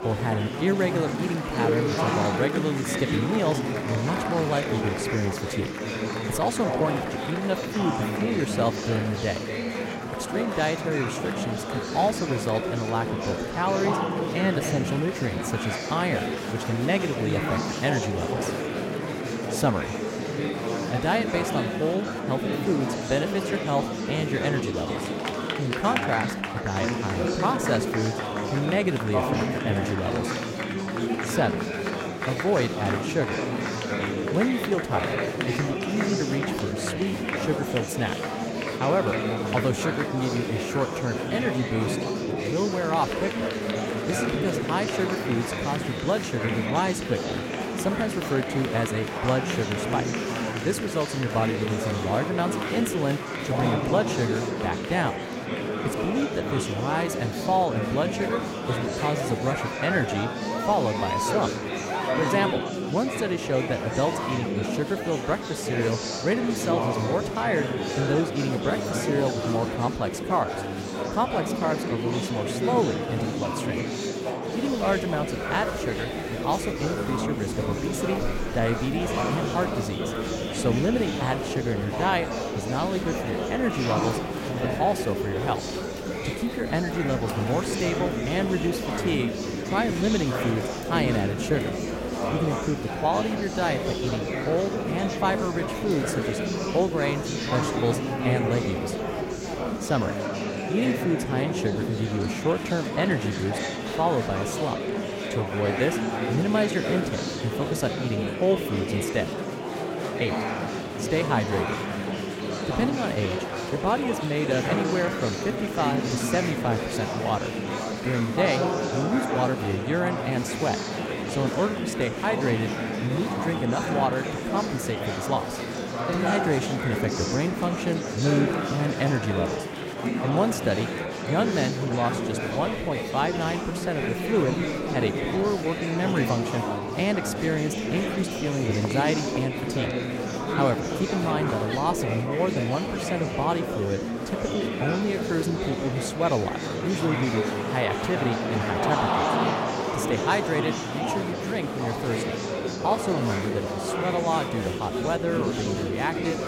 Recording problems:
murmuring crowd; loud; throughout; 1 dB below the speech

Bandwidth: 16 kHz